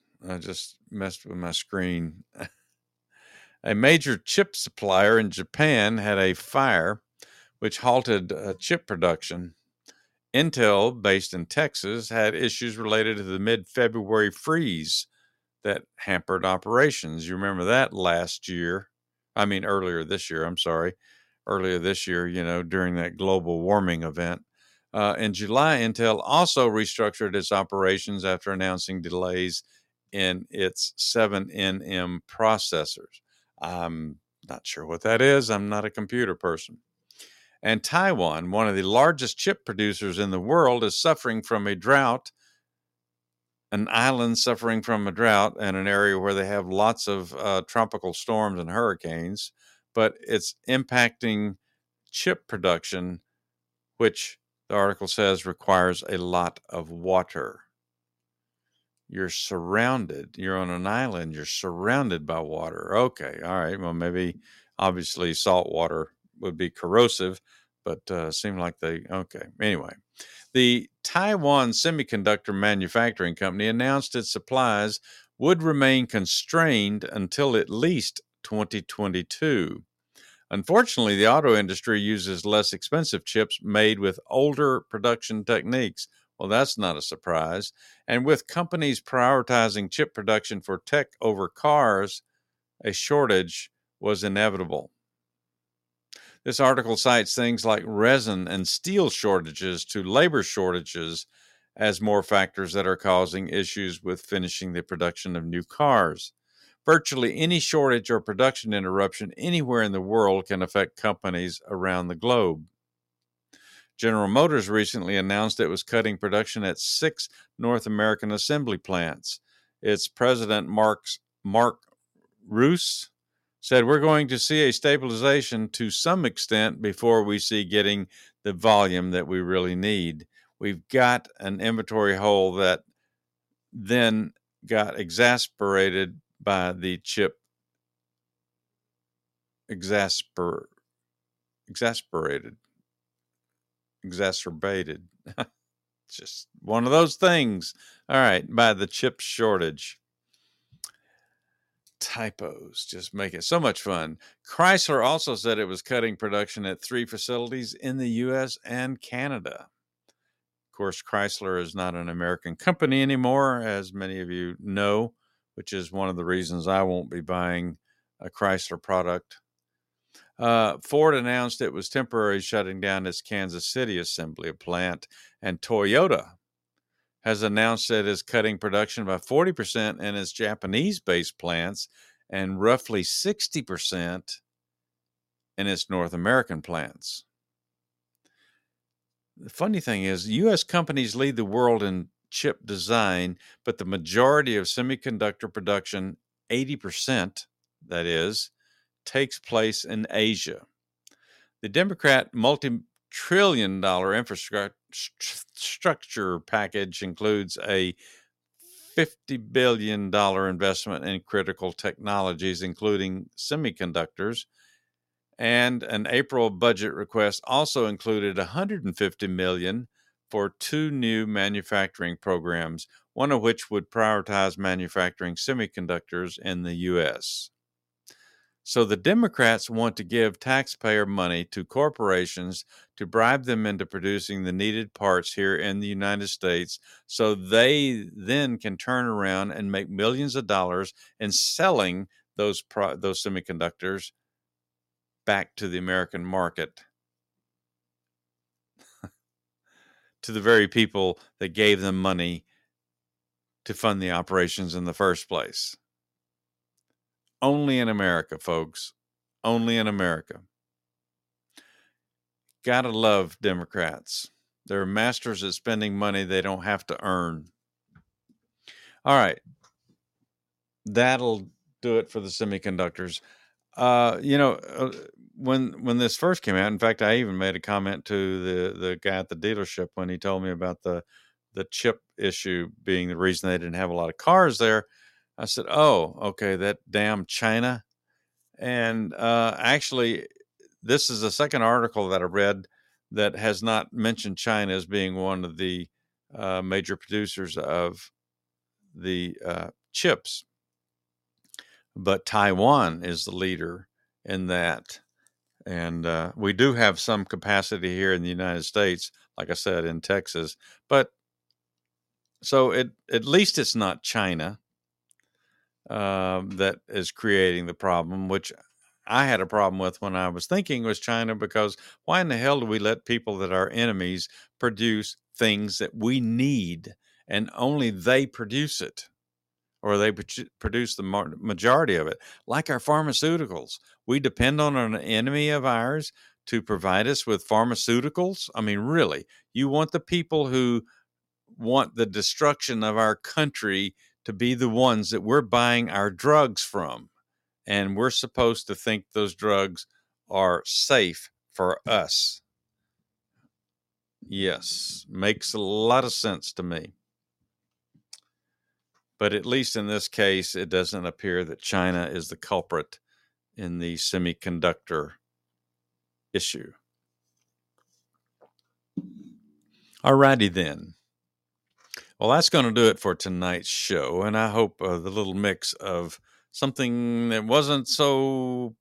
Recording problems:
none

